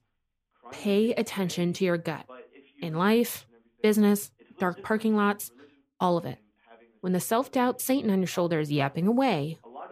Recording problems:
voice in the background; faint; throughout; 25 dB below the speech

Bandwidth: 15 kHz